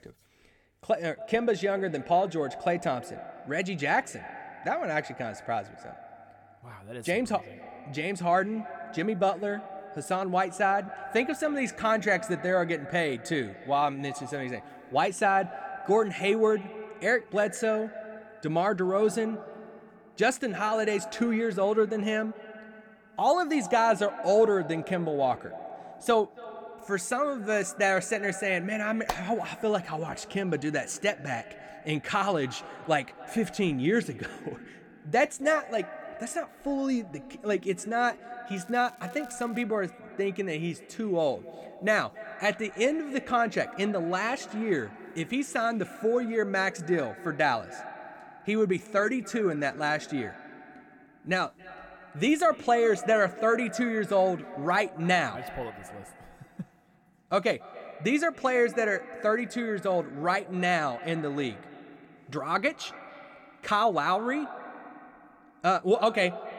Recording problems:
echo of what is said; noticeable; throughout; 280 ms later, 15 dB below the speech
crackling; faint; from 39 to 40 s; 30 dB below the speech

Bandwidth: 18 kHz